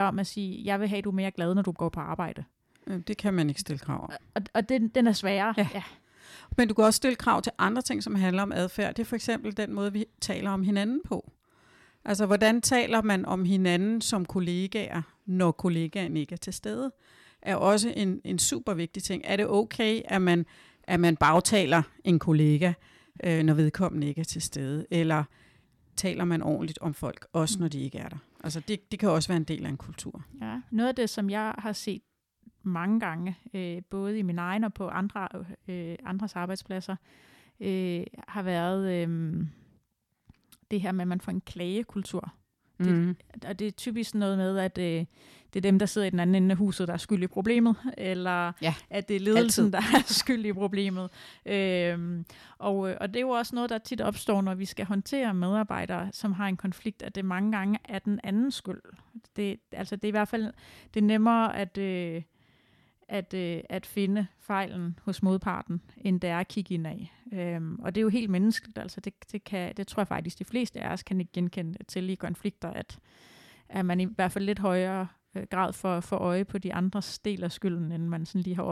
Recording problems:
abrupt cut into speech; at the start and the end

